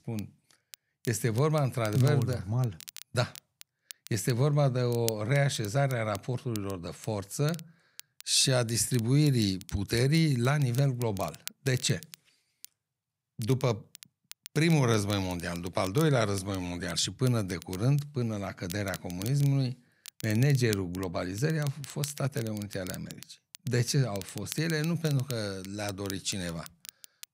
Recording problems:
crackle, like an old record; noticeable; 15 dB below the speech

